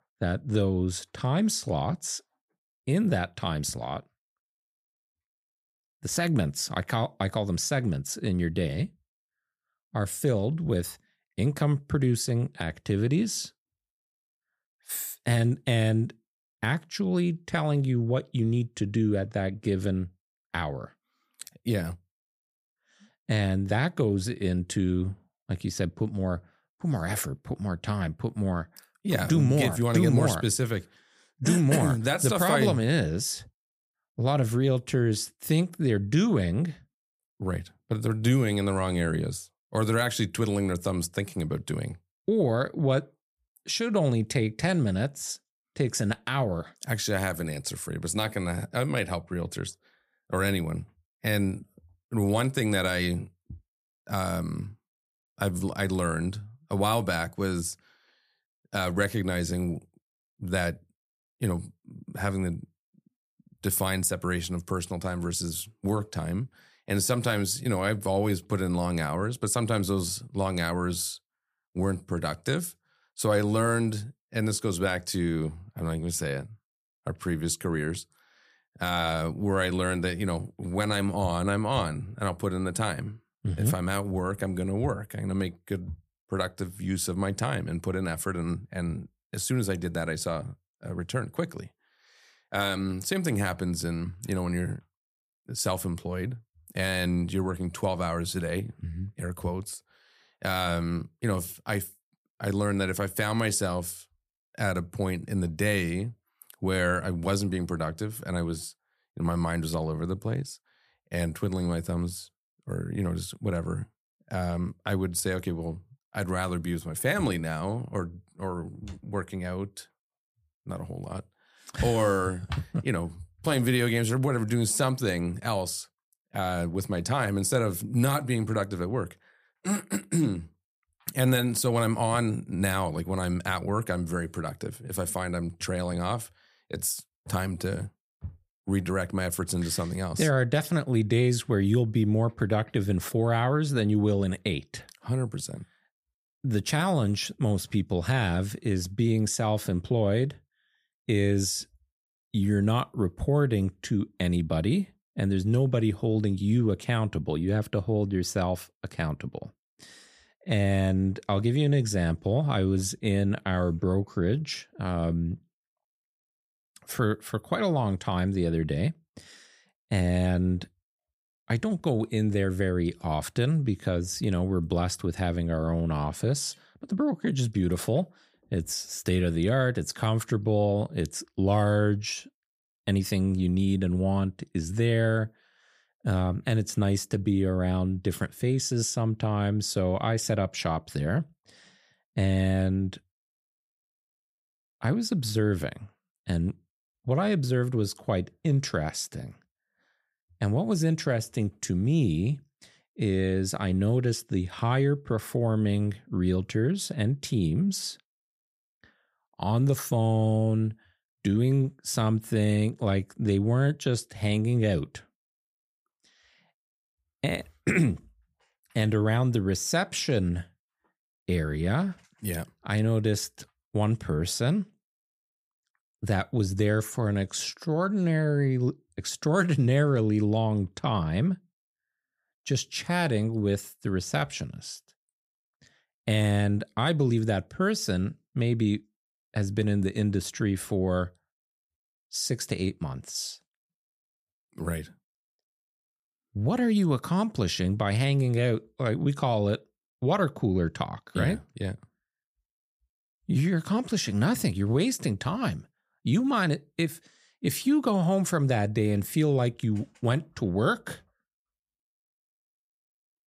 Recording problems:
none

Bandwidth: 15 kHz